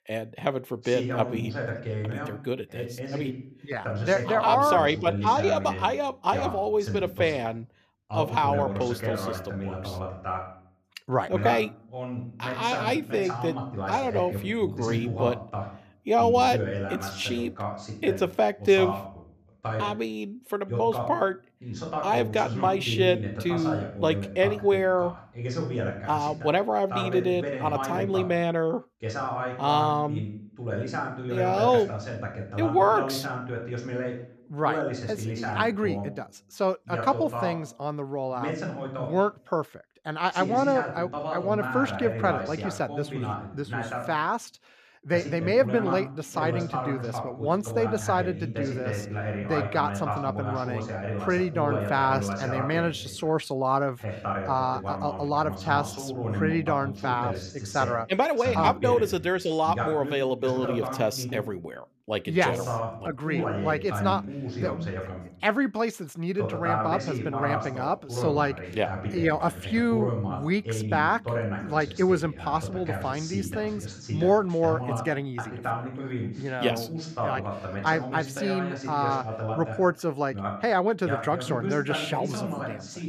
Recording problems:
voice in the background; loud; throughout; 6 dB below the speech

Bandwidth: 14.5 kHz